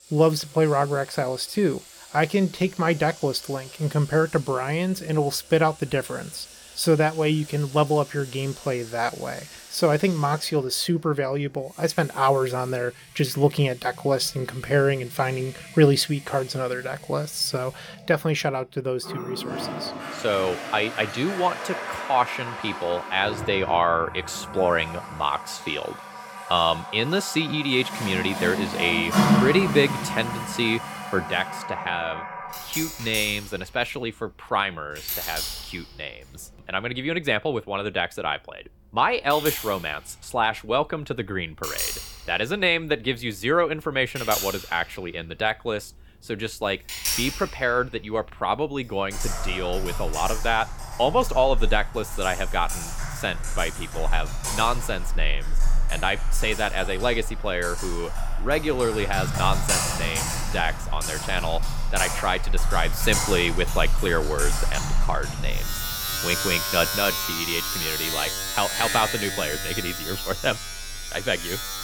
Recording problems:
household noises; loud; throughout; 4 dB below the speech

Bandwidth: 17.5 kHz